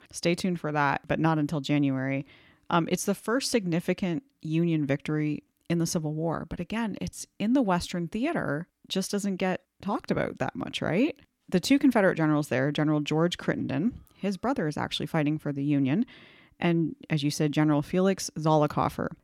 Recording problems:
none

